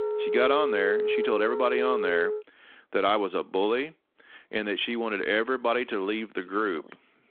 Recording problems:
phone-call audio
background music; loud; throughout; 1 dB below the speech

